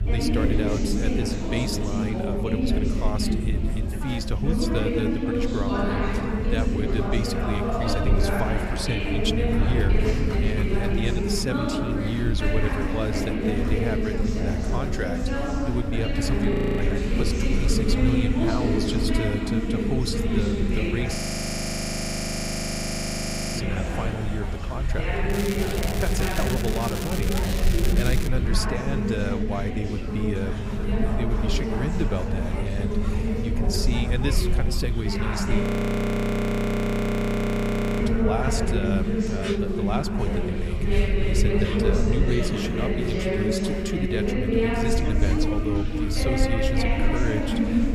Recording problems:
chatter from many people; very loud; throughout; 3 dB above the speech
crackling; loud; from 25 to 28 s; 4 dB below the speech
crowd noise; noticeable; throughout; 15 dB below the speech
low rumble; noticeable; throughout; 15 dB below the speech
audio freezing; at 17 s, at 21 s for 2.5 s and at 36 s for 2.5 s

